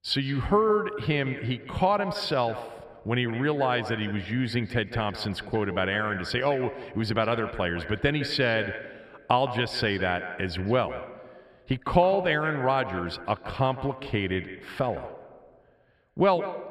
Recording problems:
echo of what is said; strong; throughout; 160 ms later, 10 dB below the speech

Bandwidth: 14.5 kHz